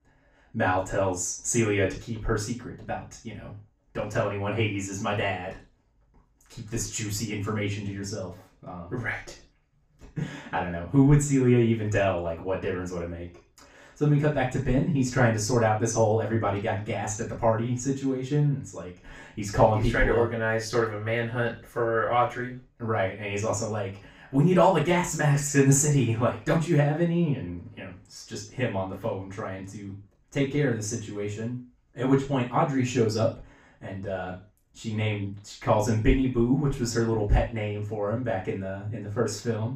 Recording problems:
off-mic speech; far
room echo; slight; dies away in 0.3 s

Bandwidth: 15.5 kHz